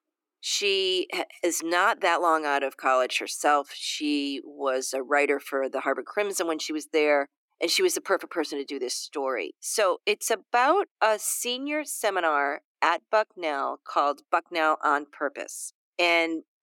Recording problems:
thin; somewhat; fading below 300 Hz

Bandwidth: 17 kHz